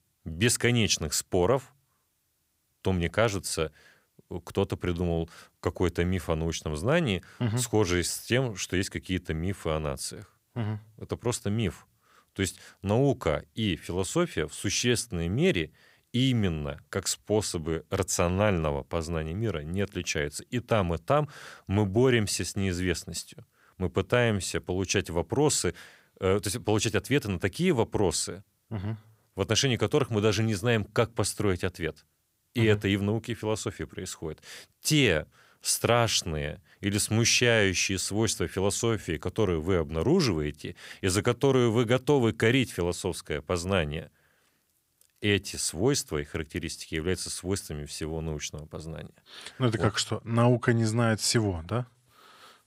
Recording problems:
none

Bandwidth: 15.5 kHz